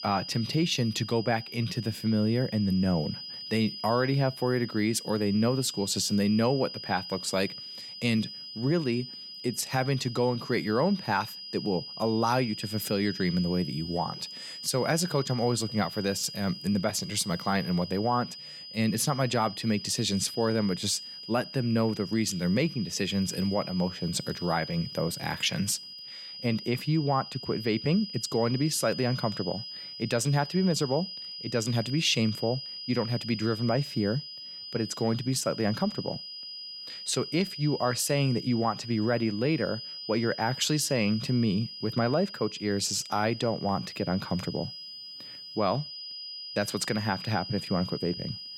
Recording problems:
high-pitched whine; loud; throughout; 5 kHz, 10 dB below the speech

